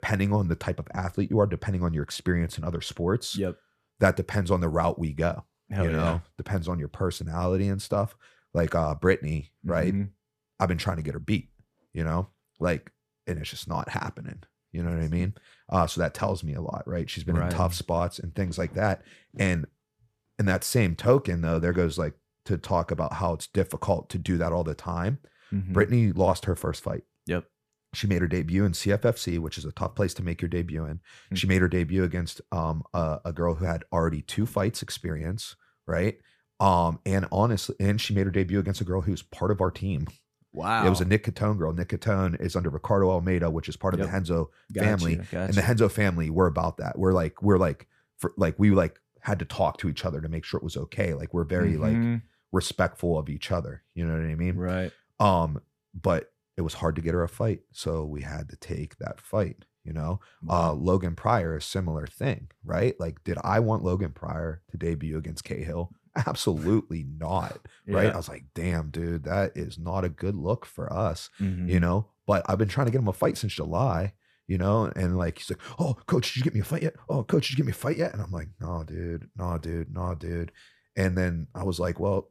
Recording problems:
none

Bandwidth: 14.5 kHz